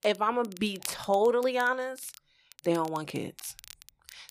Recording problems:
crackle, like an old record; noticeable; 20 dB below the speech

